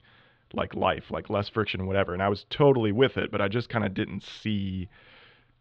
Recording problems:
muffled; slightly; fading above 4 kHz

